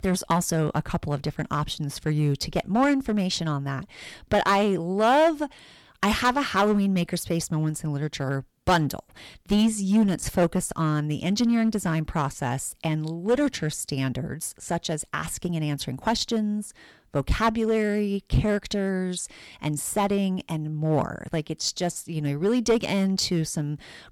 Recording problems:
distortion; slight; 4% of the sound clipped

